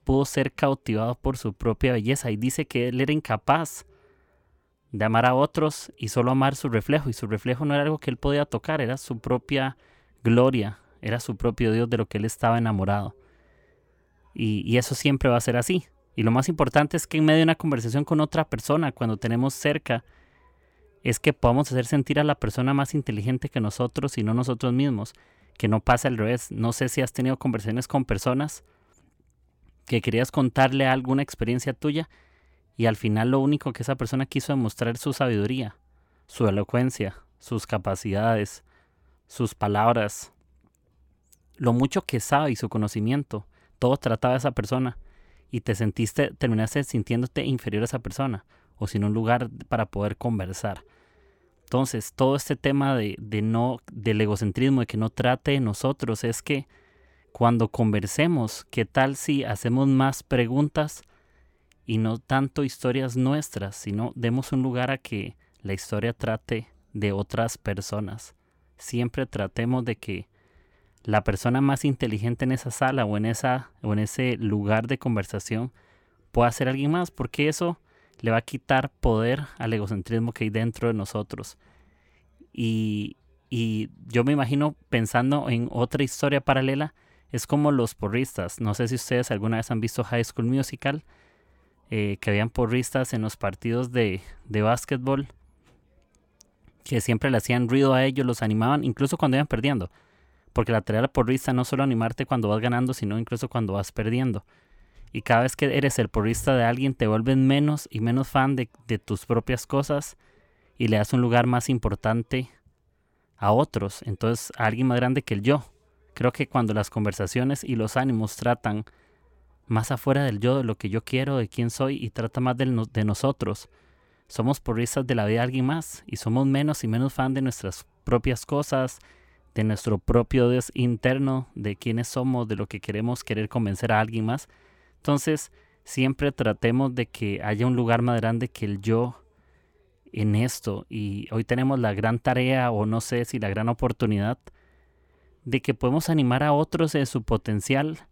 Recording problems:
none

